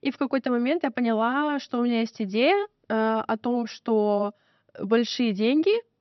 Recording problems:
high frequencies cut off; noticeable; nothing above 6 kHz

